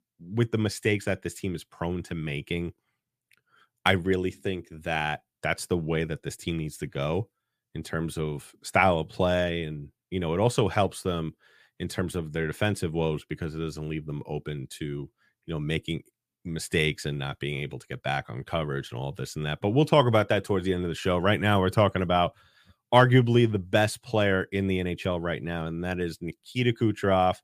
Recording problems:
none

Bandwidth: 15 kHz